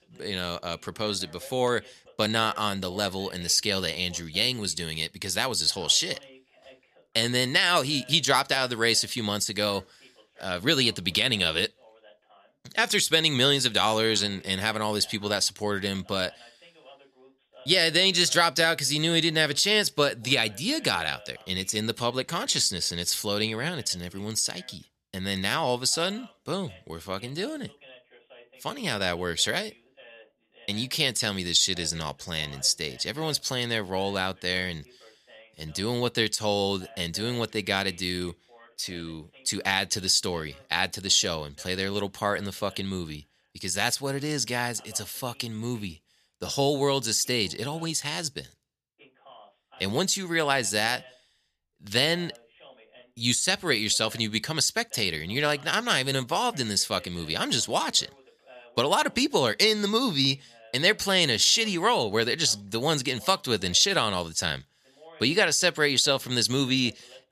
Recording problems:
voice in the background; faint; throughout; 30 dB below the speech

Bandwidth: 14.5 kHz